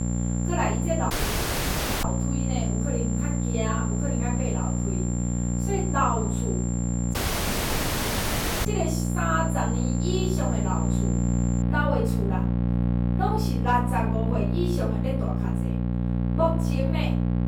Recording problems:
off-mic speech; far
room echo; noticeable; dies away in 0.4 s
electrical hum; loud; throughout; 60 Hz, 5 dB below the speech
high-pitched whine; loud; until 12 s; 7.5 kHz, 7 dB below the speech
audio cutting out; at 1 s for 1 s and at 7 s for 1.5 s

